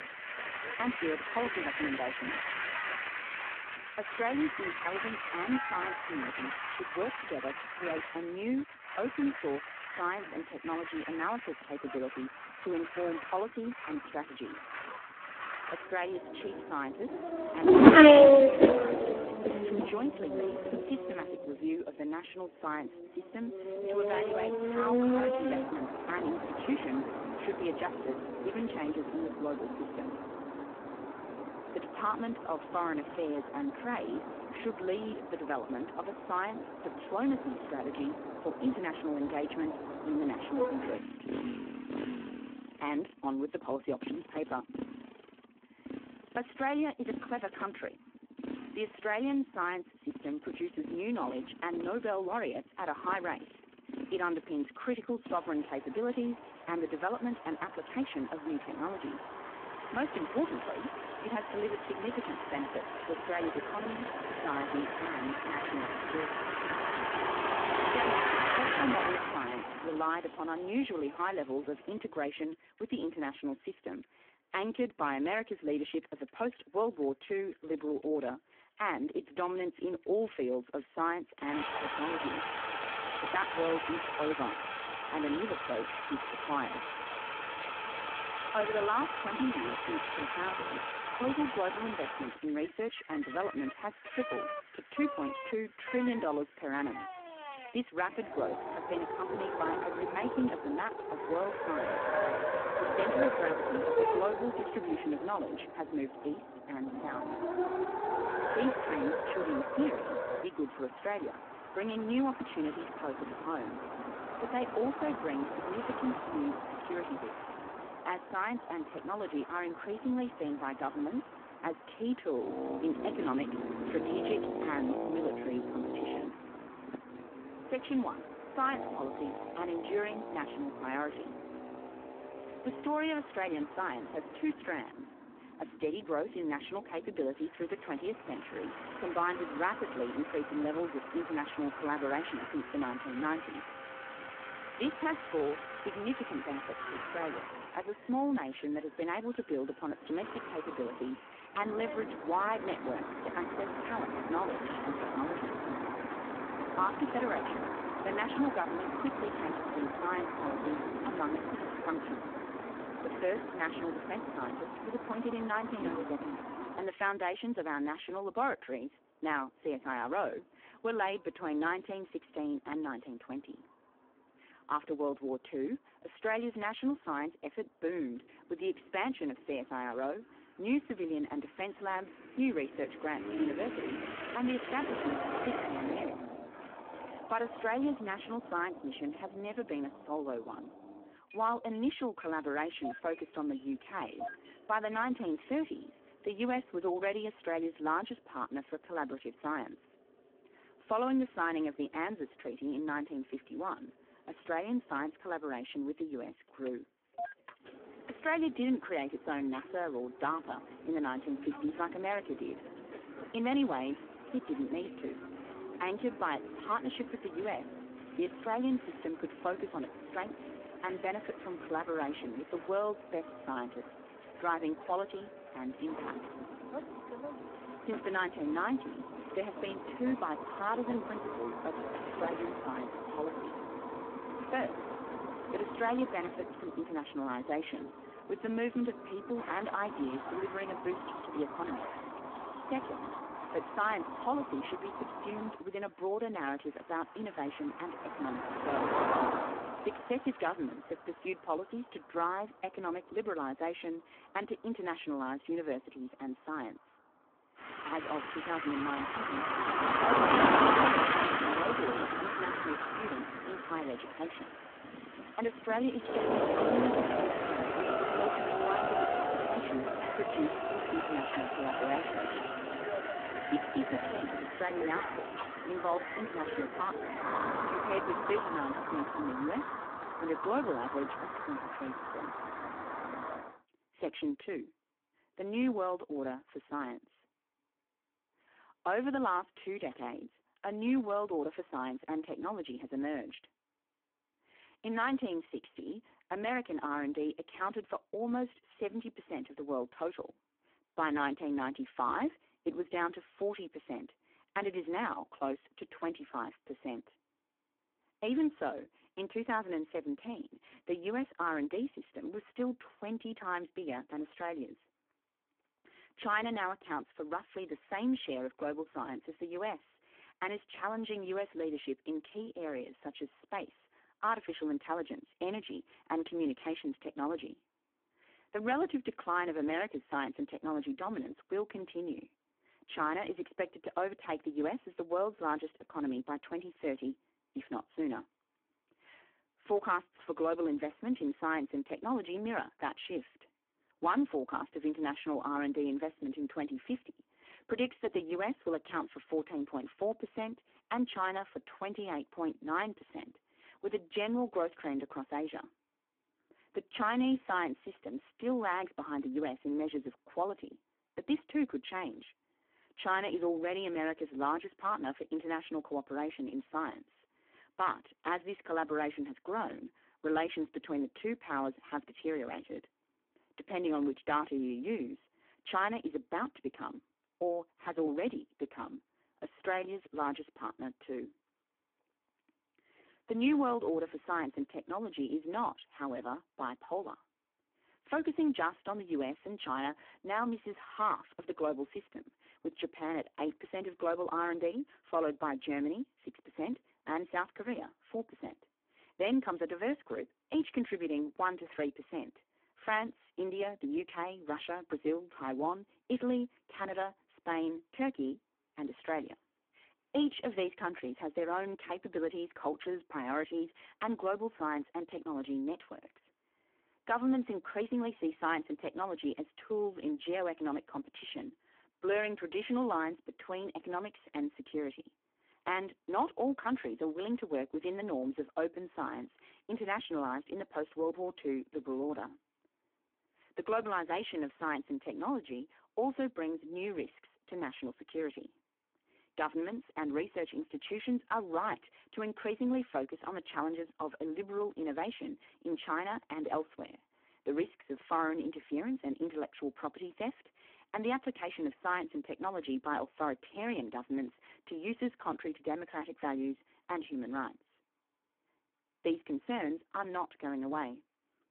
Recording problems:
phone-call audio; poor line
traffic noise; very loud; until 4:43; 3 dB above the speech

